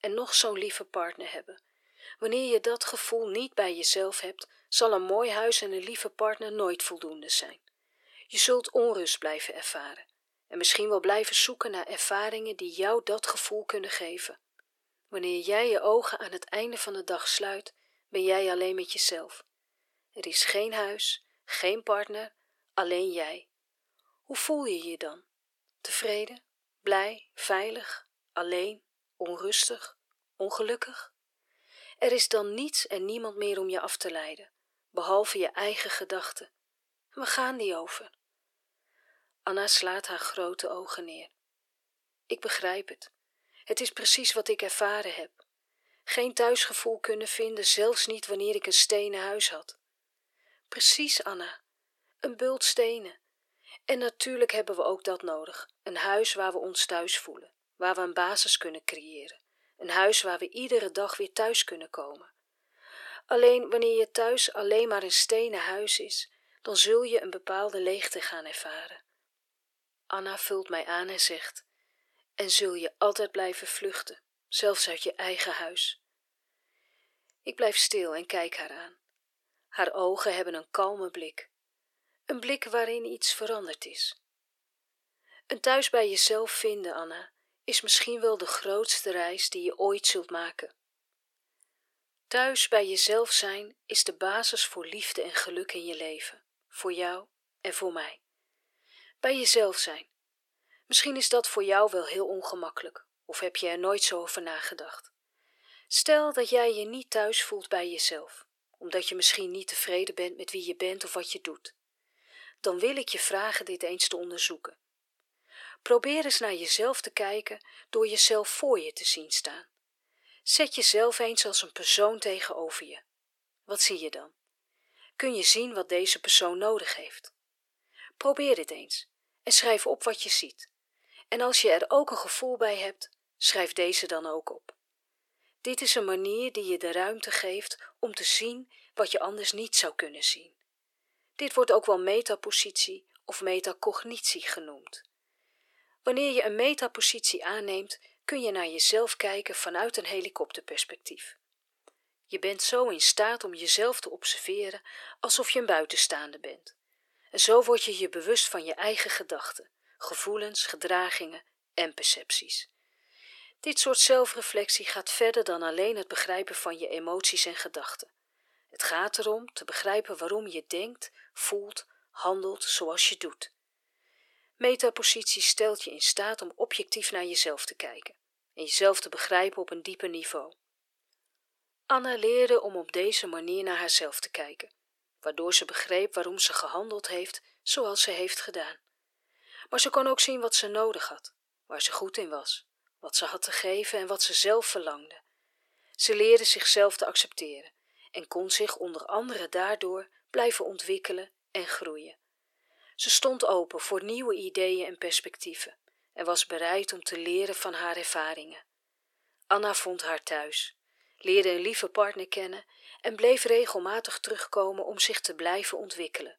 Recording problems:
thin; very; fading below 400 Hz

